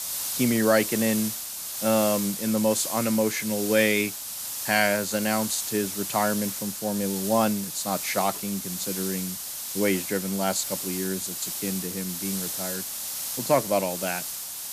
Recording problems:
hiss; loud; throughout; 4 dB below the speech

